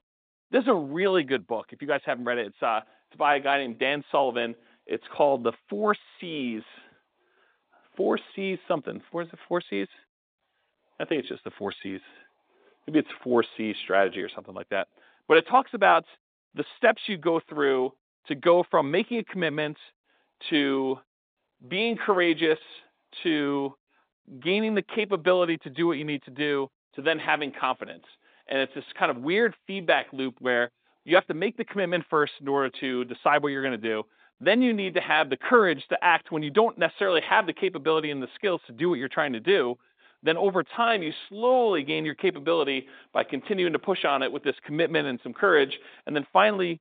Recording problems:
phone-call audio; nothing above 3.5 kHz

